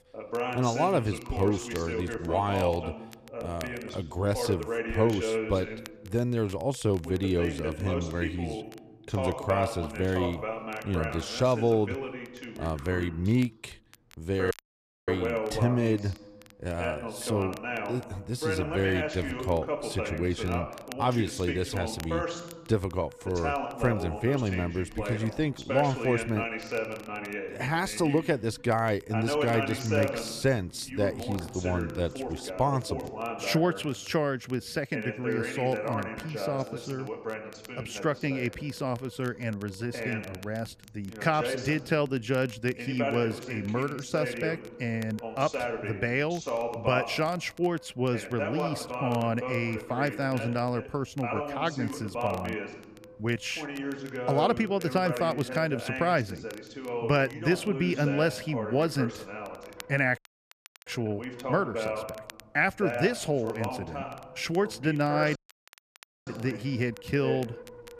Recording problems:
voice in the background; loud; throughout; 5 dB below the speech
wind noise on the microphone; occasional gusts; 20 dB below the speech
crackle, like an old record; faint; 25 dB below the speech
audio cutting out; at 15 s for 0.5 s, at 1:00 for 0.5 s and at 1:05 for 1 s

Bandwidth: 14.5 kHz